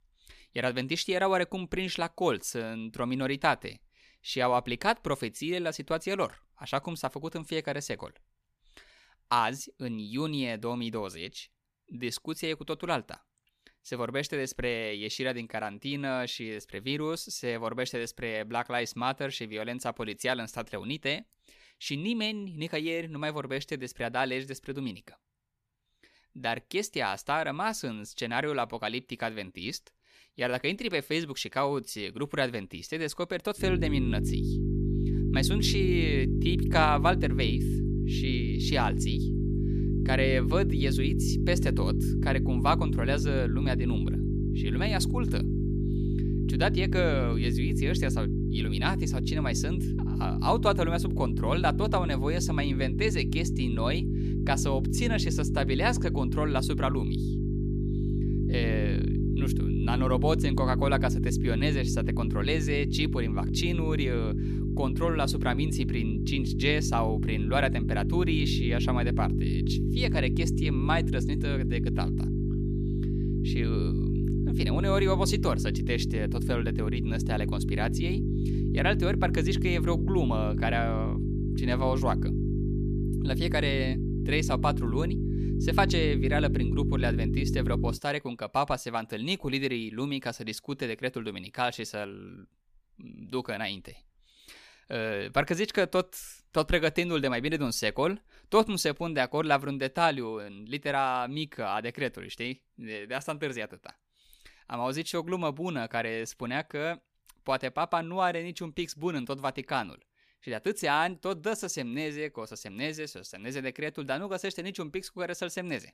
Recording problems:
electrical hum; loud; from 34 s to 1:28; 50 Hz, 6 dB below the speech

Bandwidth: 14.5 kHz